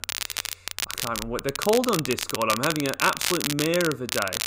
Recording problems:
crackle, like an old record; loud; 3 dB below the speech

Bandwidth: 15.5 kHz